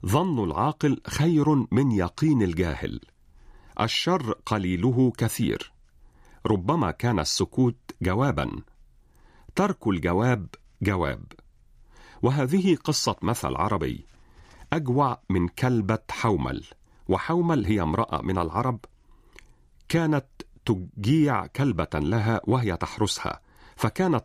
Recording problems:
none

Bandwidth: 15 kHz